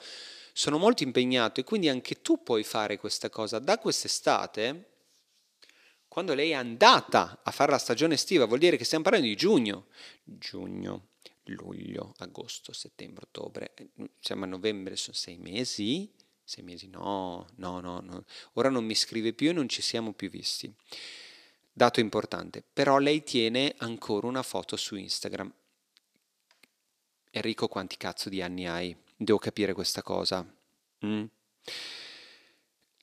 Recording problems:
thin; somewhat; fading below 400 Hz

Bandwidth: 14.5 kHz